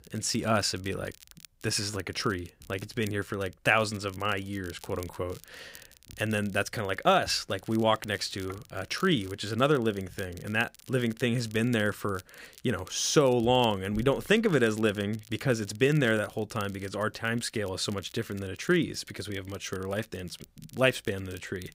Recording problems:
crackle, like an old record; faint; 25 dB below the speech

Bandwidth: 15.5 kHz